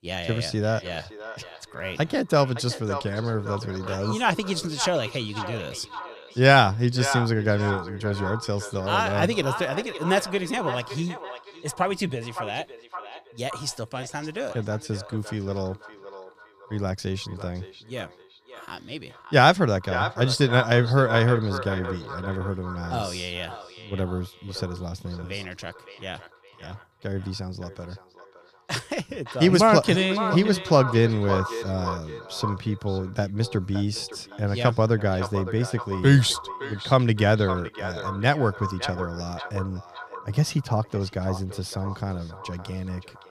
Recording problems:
echo of what is said; strong; throughout; 560 ms later, 10 dB below the speech

